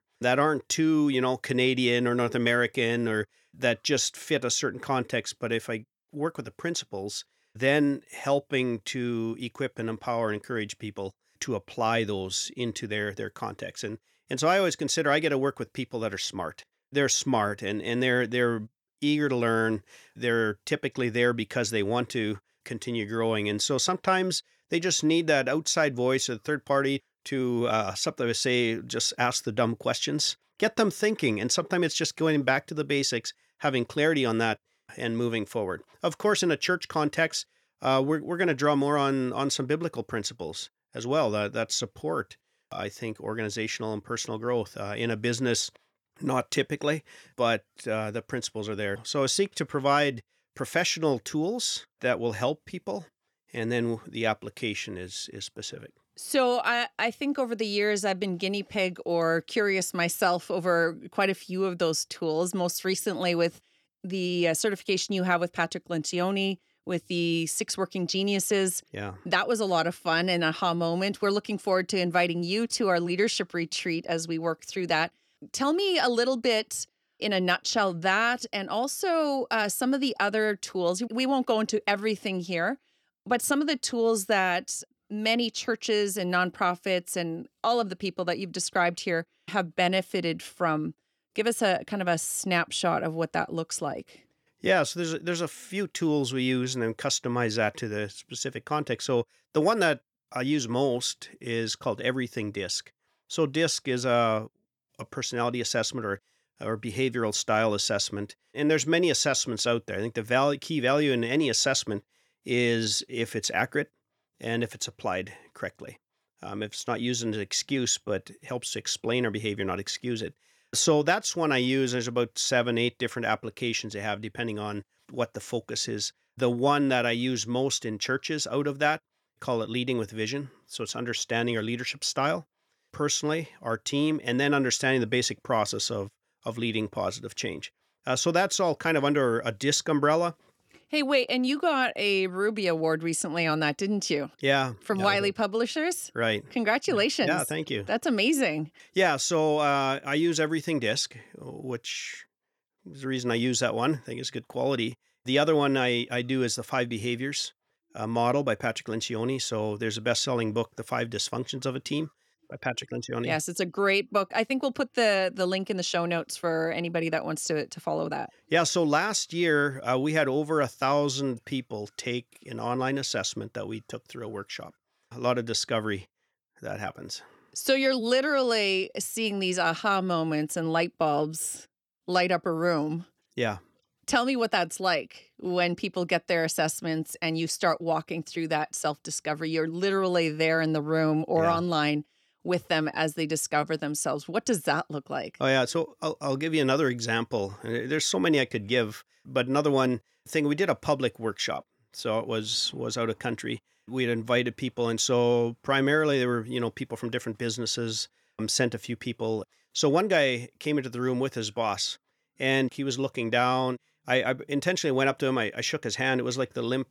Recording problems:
none

